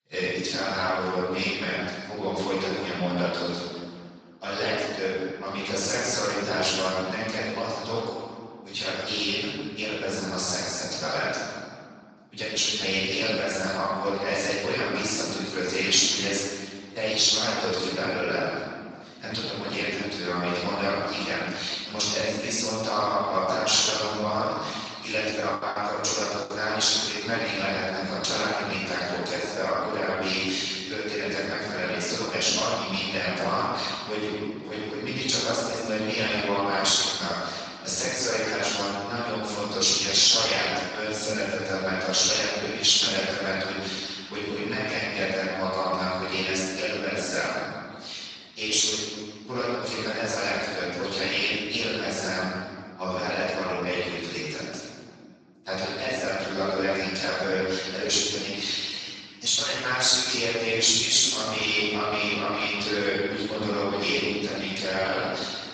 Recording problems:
room echo; strong; dies away in 1.8 s
off-mic speech; far
garbled, watery; badly; nothing above 7.5 kHz
thin; somewhat; fading below 450 Hz
choppy; very; from 25 to 27 s; 13% of the speech affected

